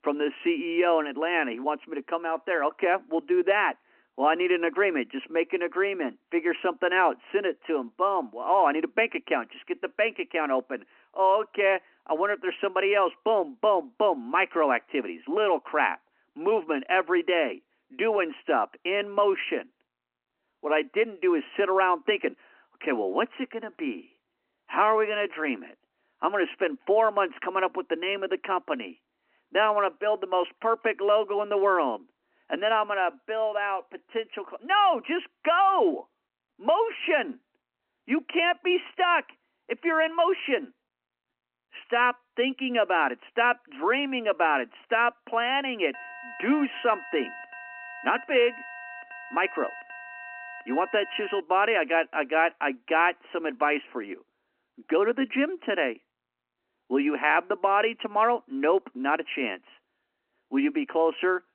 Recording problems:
phone-call audio; nothing above 3 kHz
alarm; faint; from 46 to 51 s; peak 15 dB below the speech

